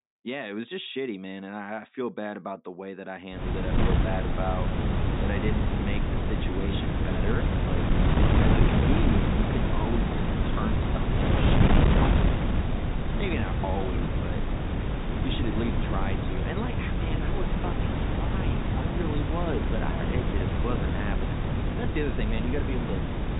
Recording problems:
high frequencies cut off; severe; nothing above 4 kHz
wind noise on the microphone; heavy; from 3.5 s on; 3 dB above the speech

